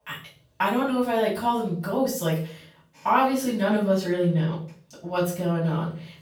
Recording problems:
off-mic speech; far
room echo; noticeable; dies away in 0.4 s

